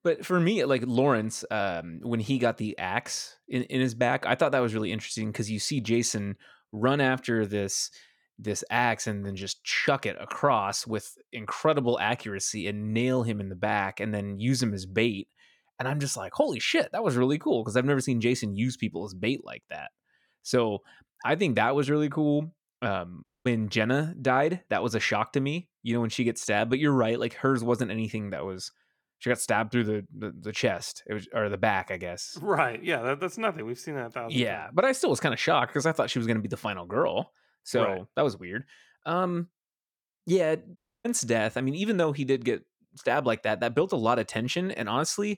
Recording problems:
audio cutting out; at 23 s and at 41 s

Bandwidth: 19 kHz